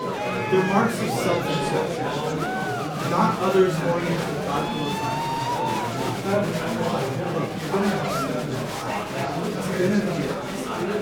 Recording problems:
off-mic speech; far
room echo; slight; dies away in 0.5 s
murmuring crowd; loud; throughout; as loud as the speech

